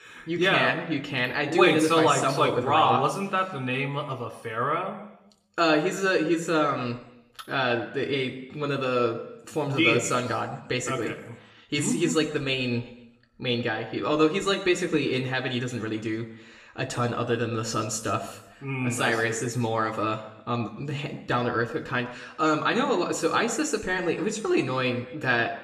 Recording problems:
room echo; slight; dies away in 0.7 s
off-mic speech; somewhat distant

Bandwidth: 15 kHz